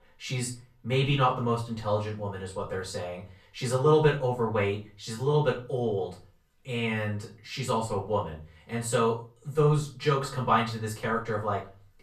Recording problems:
off-mic speech; far
room echo; slight; dies away in 0.3 s

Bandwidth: 13.5 kHz